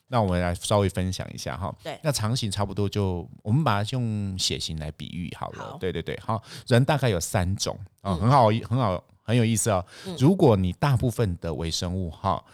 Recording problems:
none

